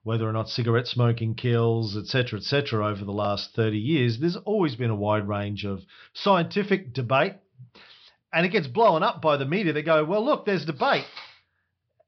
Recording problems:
high frequencies cut off; noticeable; nothing above 5.5 kHz

